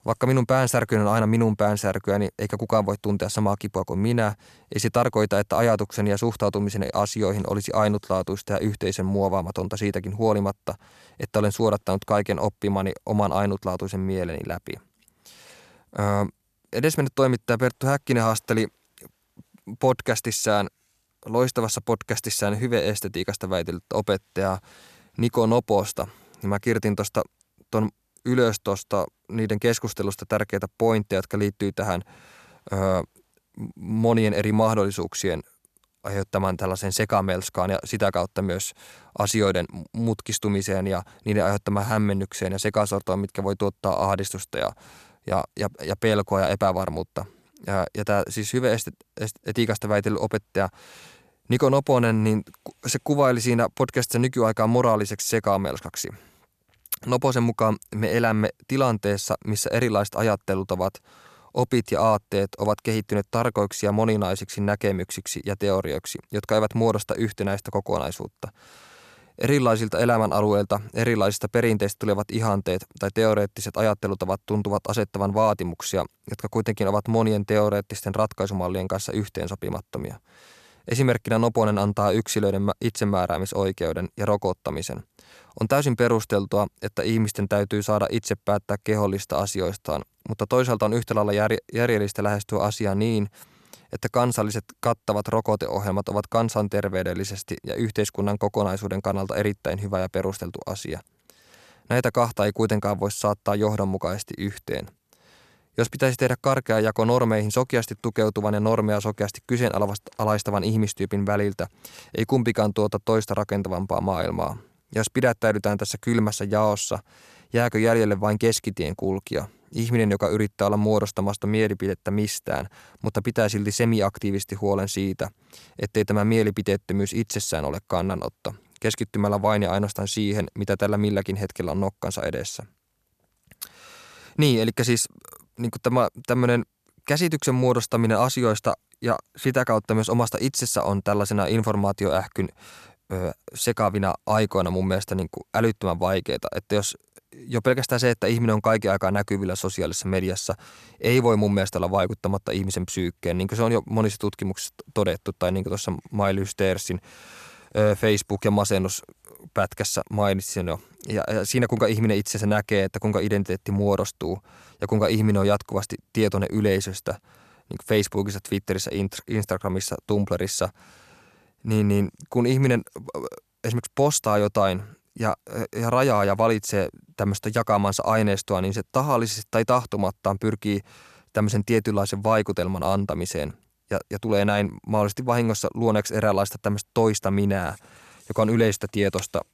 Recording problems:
none

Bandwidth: 14 kHz